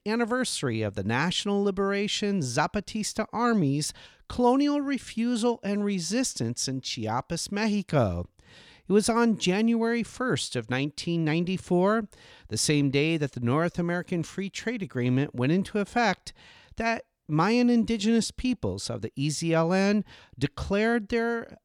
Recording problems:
none

